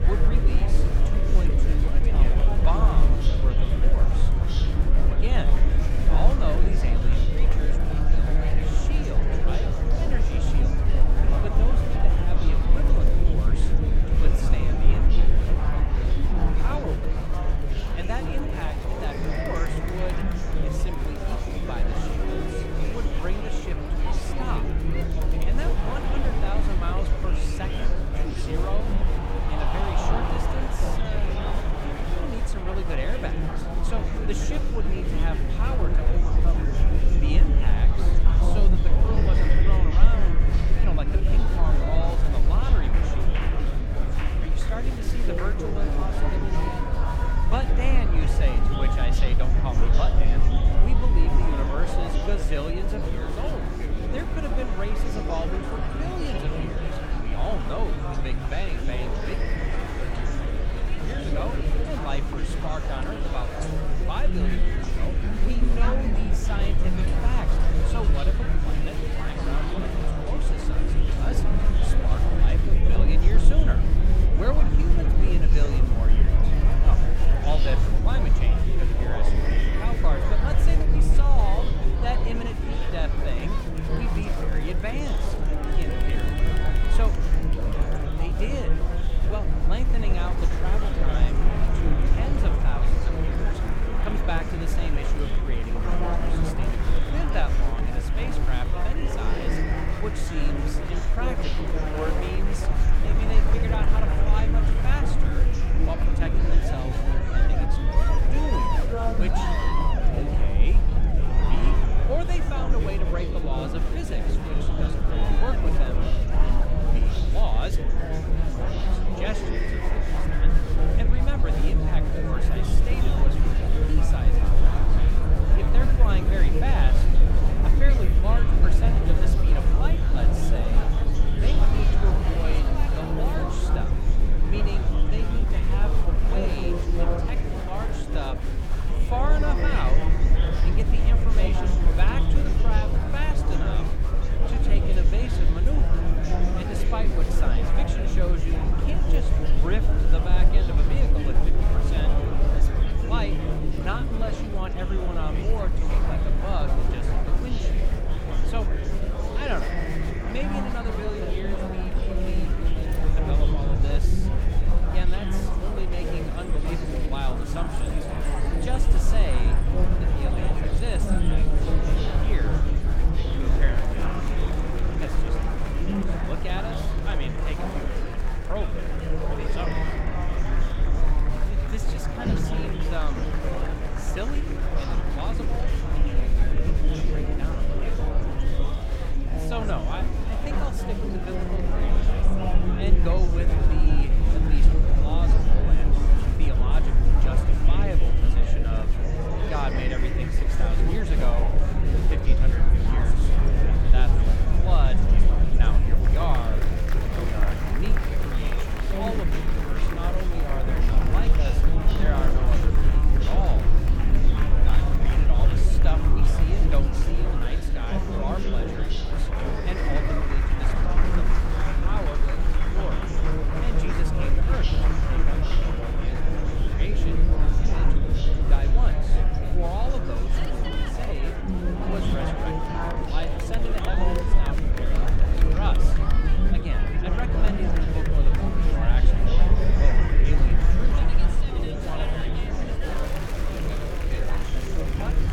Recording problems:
murmuring crowd; very loud; throughout; 3 dB above the speech
low rumble; loud; throughout; 8 dB below the speech

